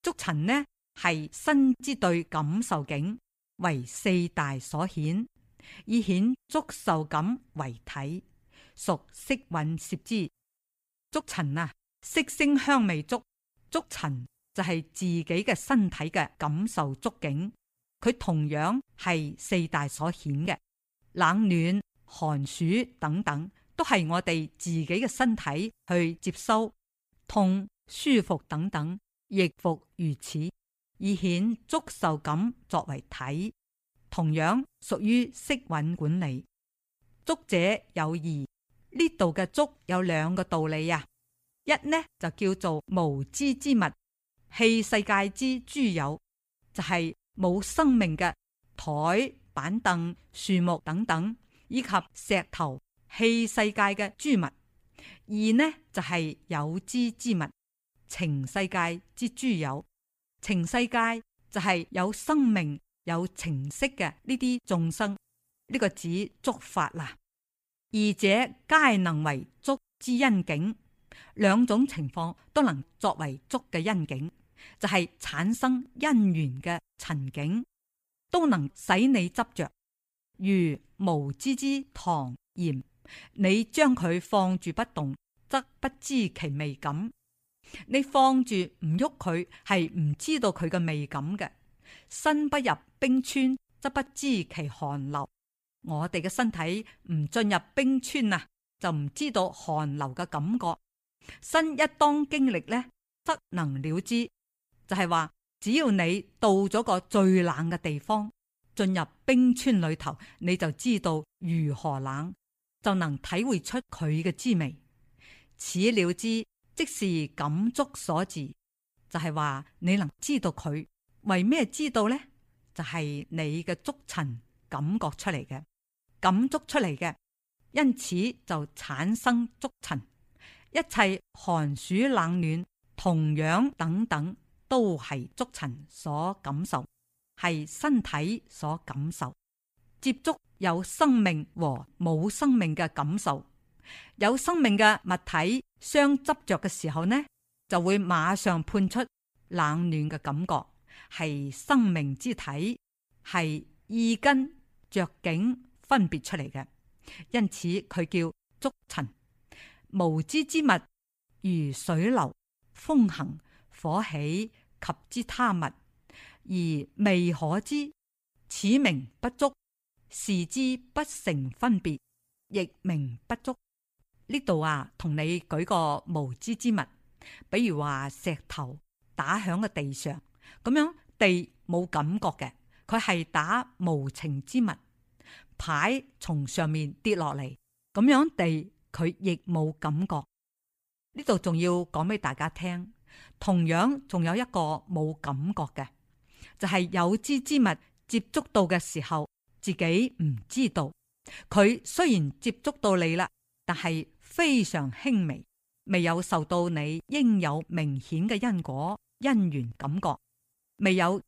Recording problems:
none

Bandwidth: 15 kHz